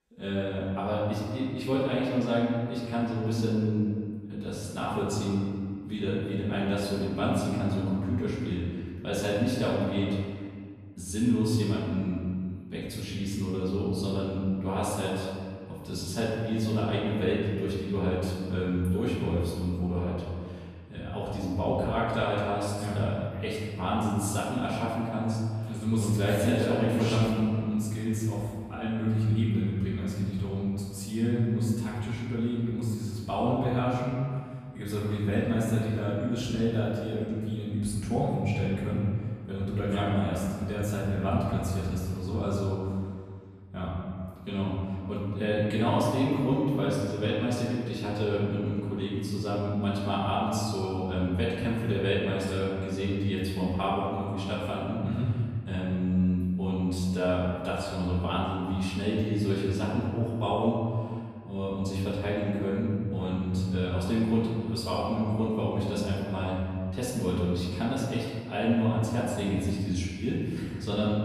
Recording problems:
room echo; strong; dies away in 1.9 s
off-mic speech; far

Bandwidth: 14.5 kHz